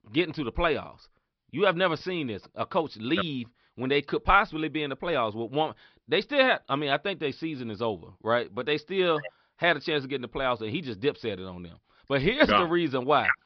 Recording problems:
high frequencies cut off; noticeable; nothing above 5.5 kHz

